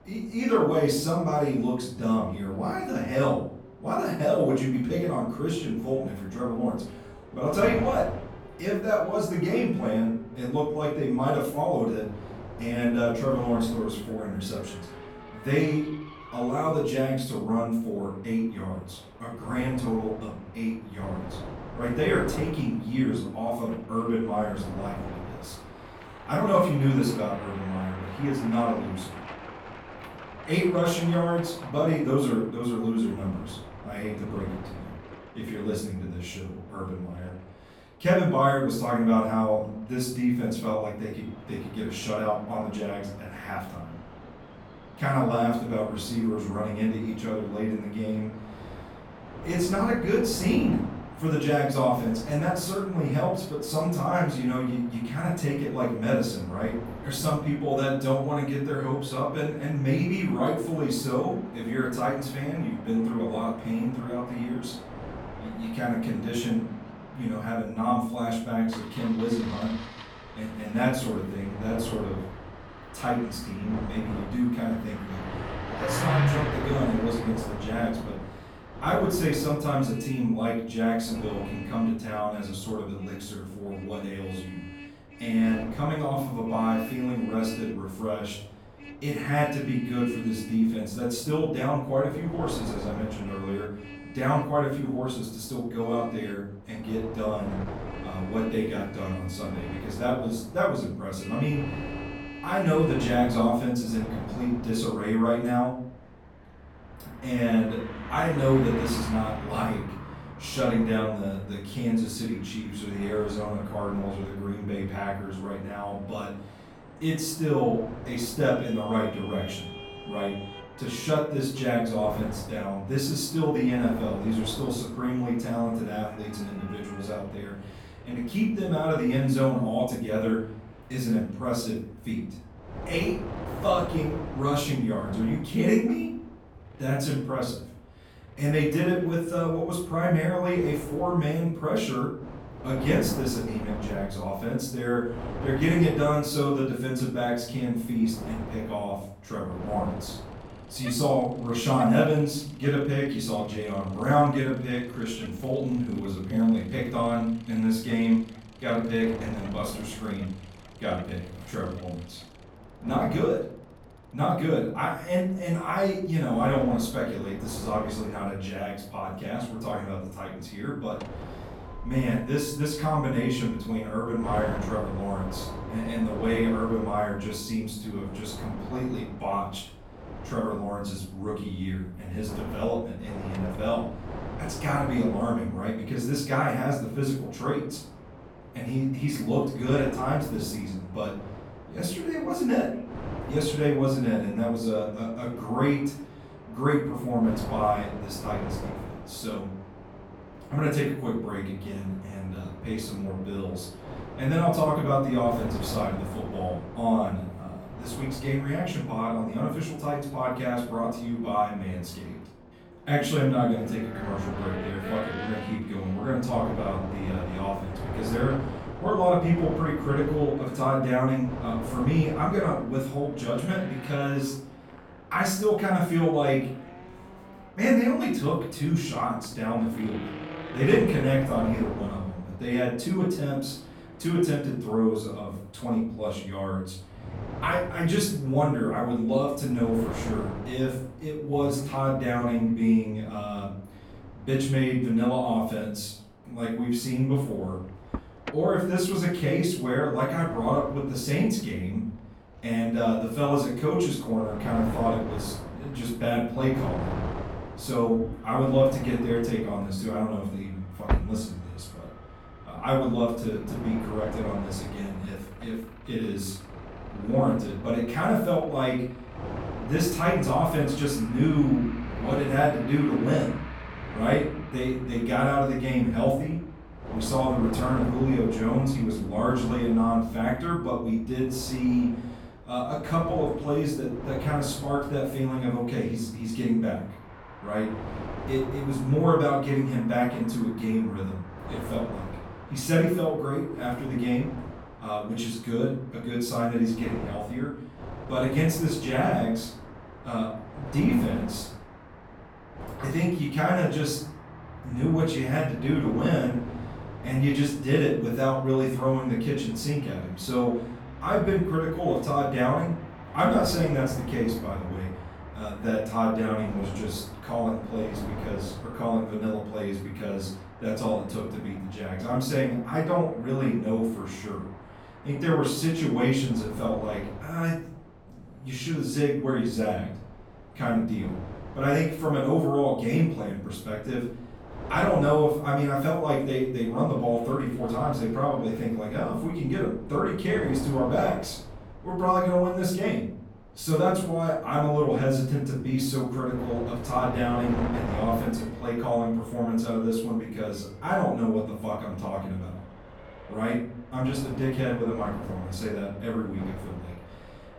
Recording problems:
off-mic speech; far
room echo; noticeable; dies away in 0.5 s
traffic noise; noticeable; throughout; 15 dB below the speech
wind noise on the microphone; occasional gusts; 15 dB below the speech

